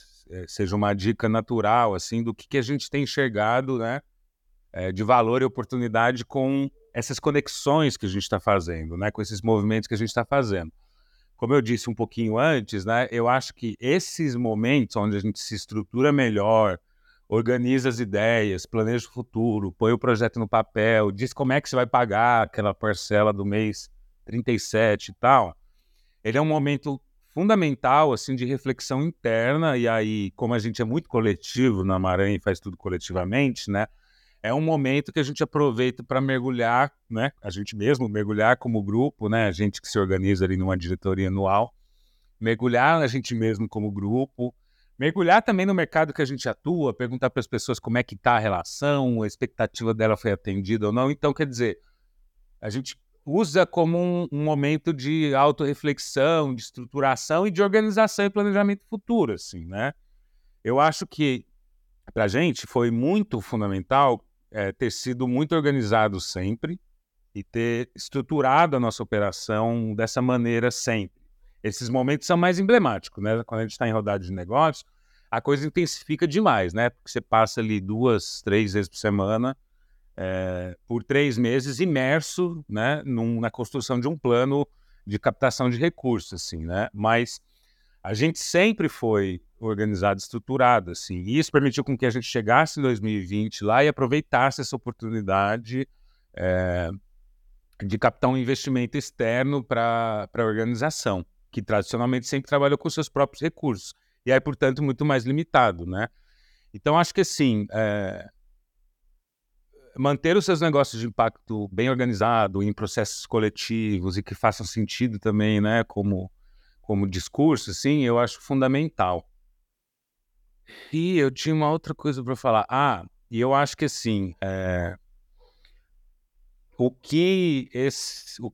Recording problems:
uneven, jittery; strongly; from 16 s to 1:53

